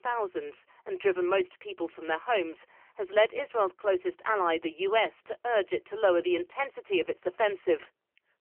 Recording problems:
phone-call audio; poor line; nothing above 3 kHz

